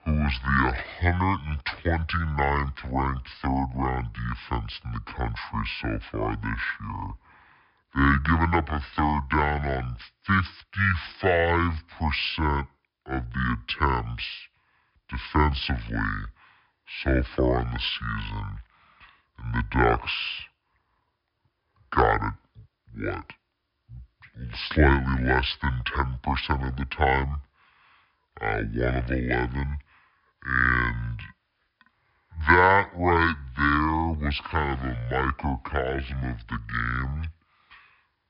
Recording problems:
wrong speed and pitch; too slow and too low; 0.6 times normal speed
high frequencies cut off; noticeable; nothing above 5.5 kHz

